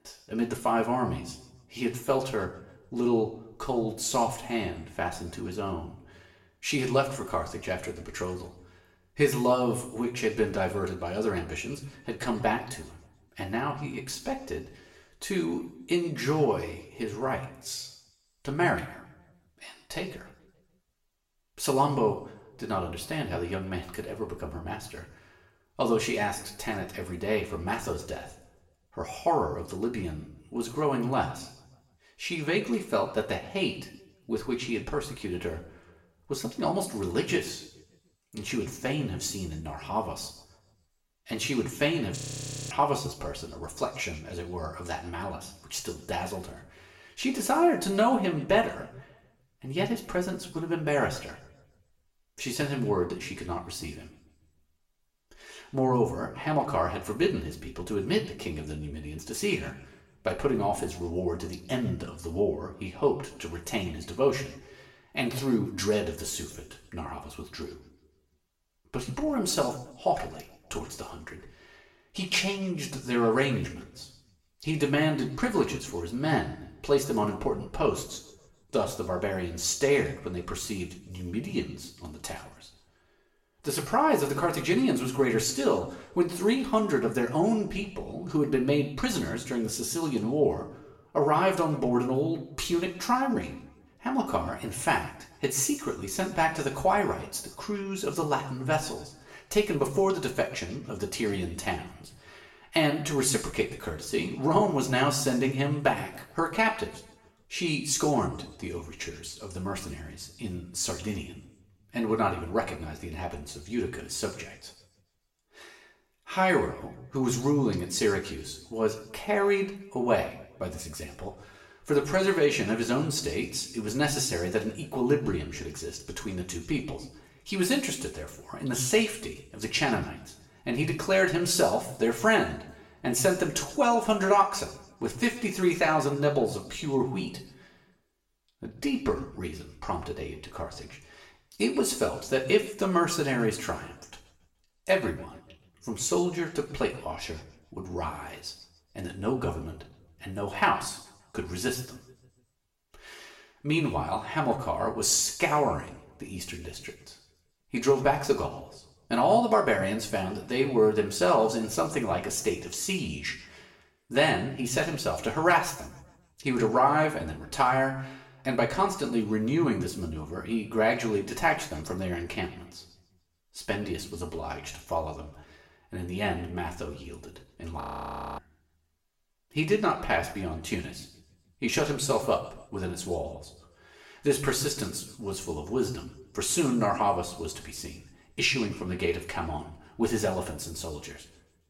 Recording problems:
room echo; slight; dies away in 0.6 s
off-mic speech; somewhat distant
audio freezing; at 42 s for 0.5 s and at 2:58 for 0.5 s

